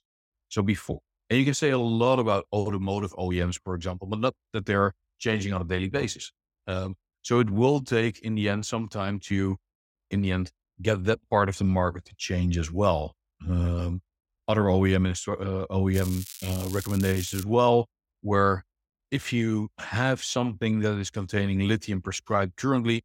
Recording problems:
crackling; noticeable; from 16 to 17 s; 10 dB below the speech

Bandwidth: 16 kHz